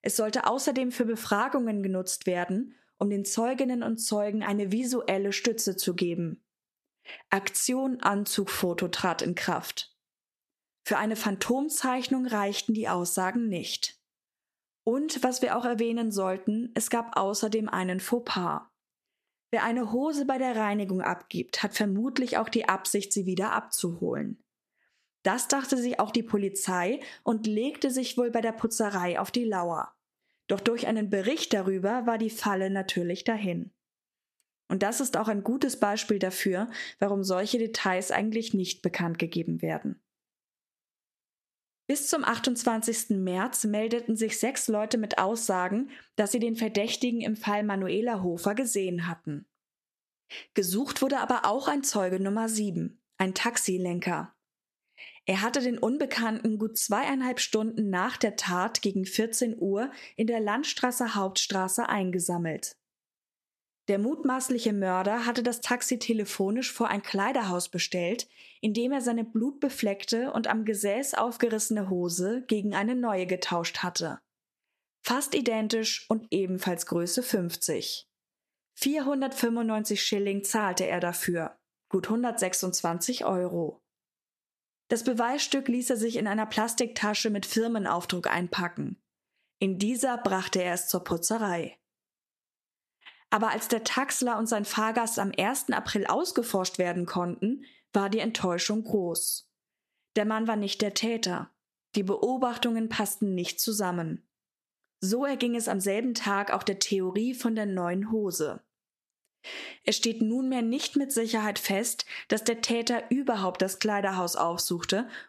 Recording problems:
squashed, flat; somewhat

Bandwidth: 13.5 kHz